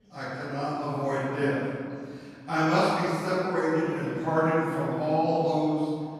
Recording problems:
room echo; strong; dies away in 2.1 s
off-mic speech; far
voice in the background; faint; throughout; 20 dB below the speech

